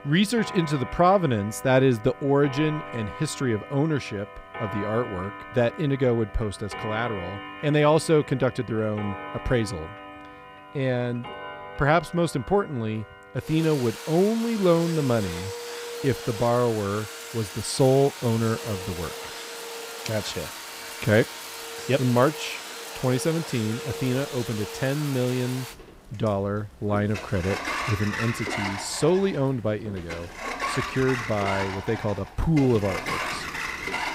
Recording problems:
household noises; loud; throughout; 9 dB below the speech

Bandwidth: 15.5 kHz